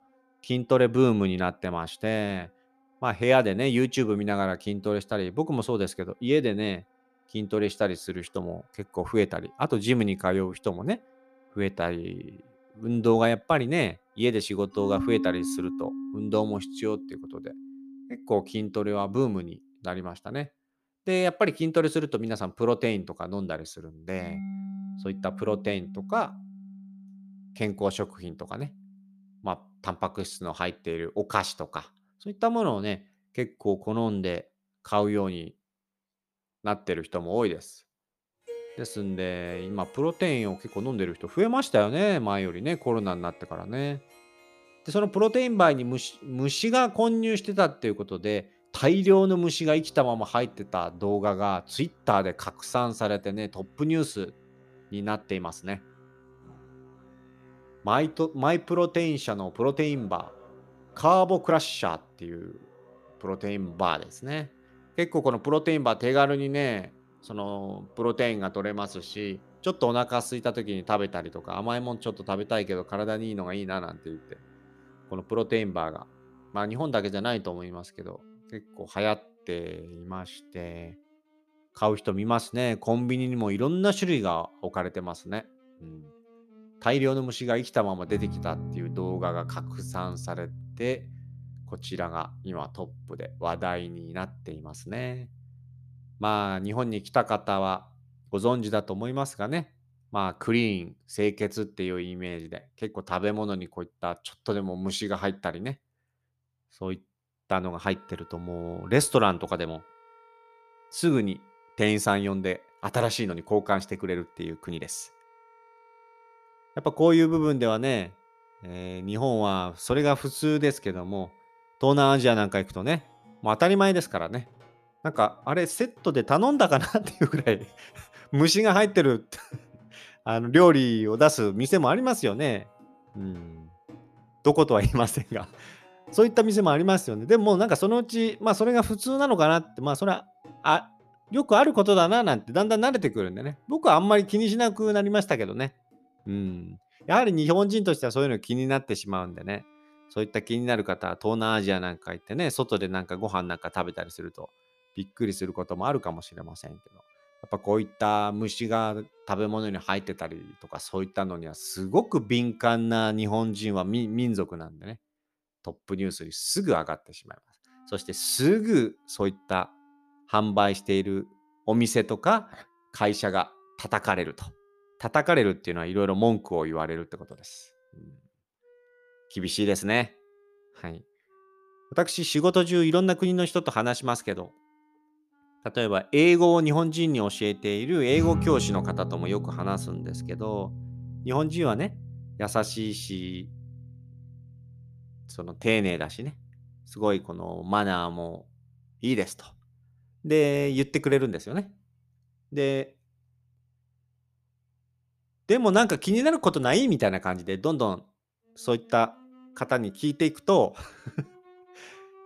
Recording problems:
background music; noticeable; throughout; 15 dB below the speech

